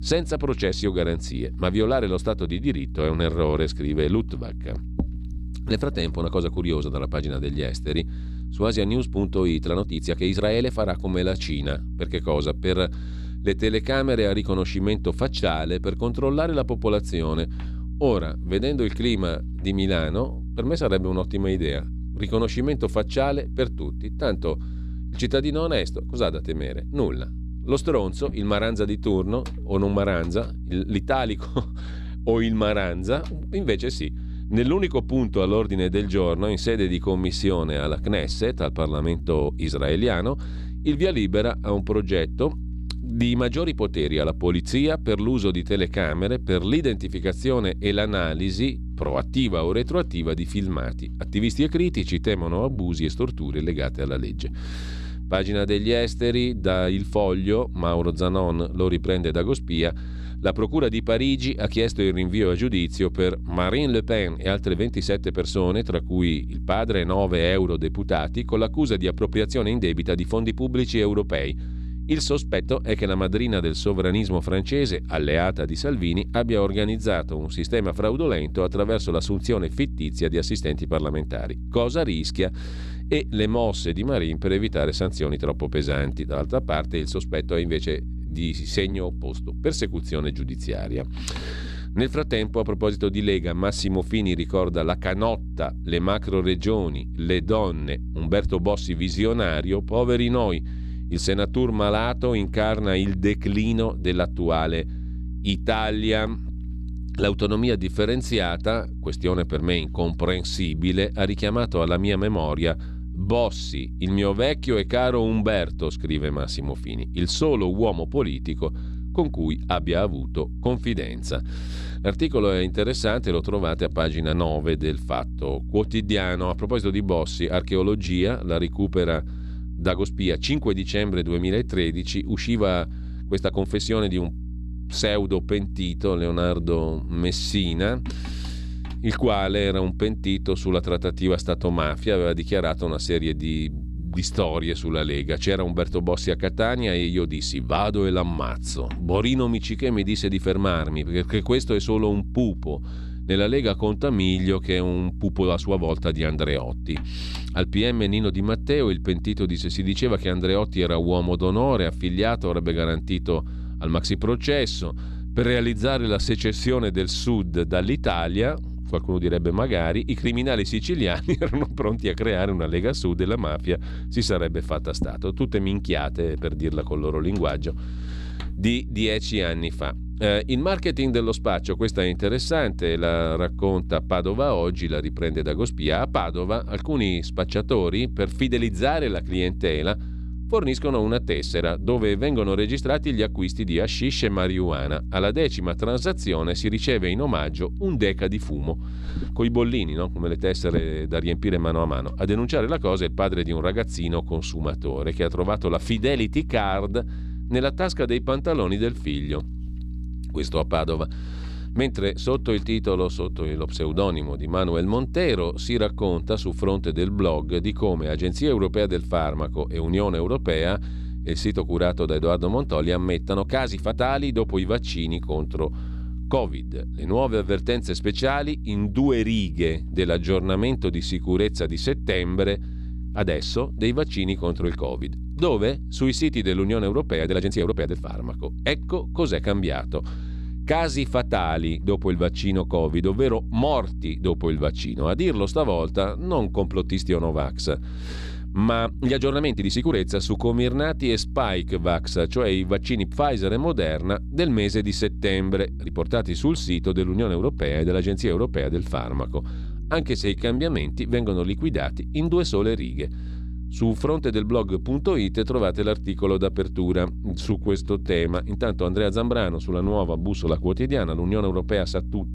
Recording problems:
electrical hum; faint; throughout; 60 Hz, 20 dB below the speech
uneven, jittery; strongly; from 9.5 s to 4:28

